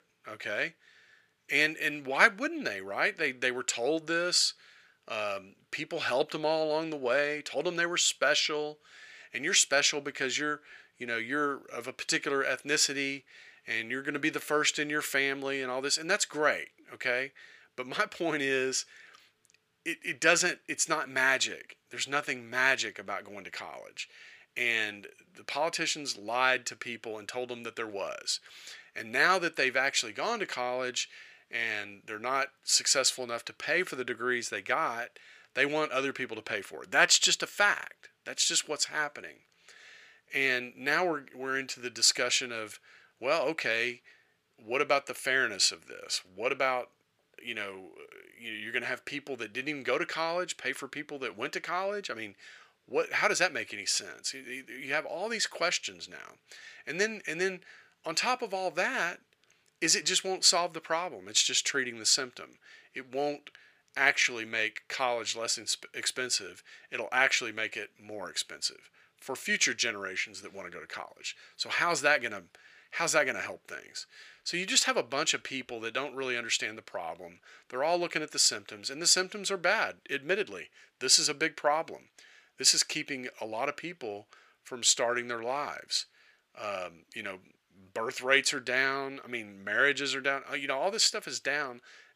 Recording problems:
thin; somewhat; fading below 950 Hz

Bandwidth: 15 kHz